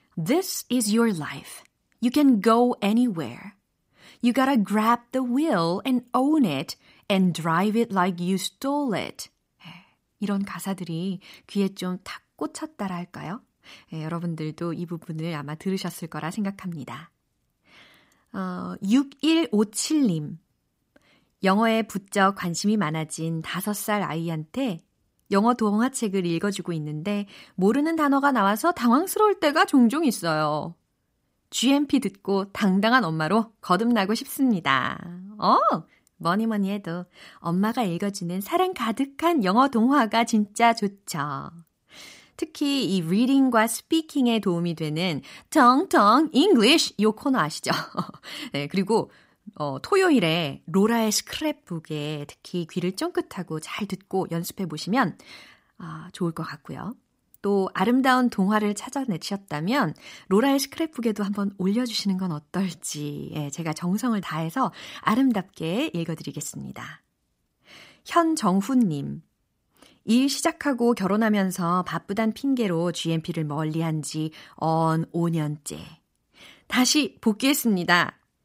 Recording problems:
none

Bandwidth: 15.5 kHz